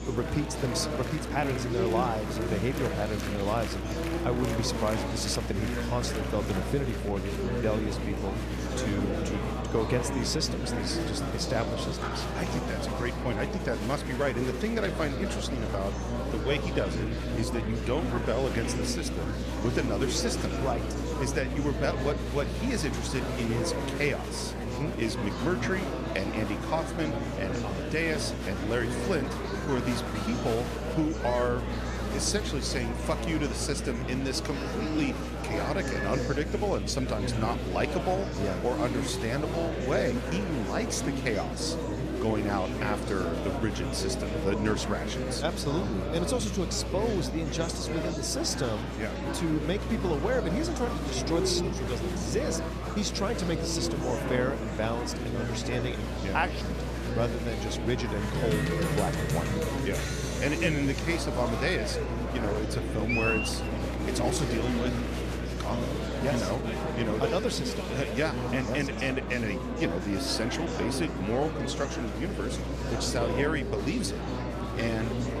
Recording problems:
murmuring crowd; loud; throughout; 1 dB below the speech
electrical hum; noticeable; throughout; 60 Hz, 15 dB below the speech

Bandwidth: 14.5 kHz